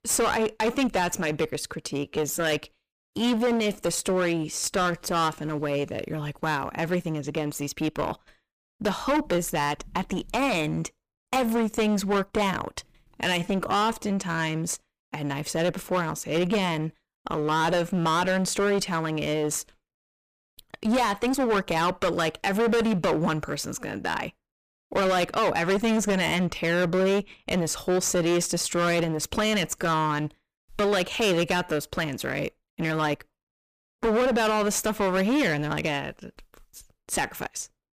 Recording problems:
distortion; heavy; 16% of the sound clipped
uneven, jittery; strongly; from 0.5 to 30 s

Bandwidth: 15 kHz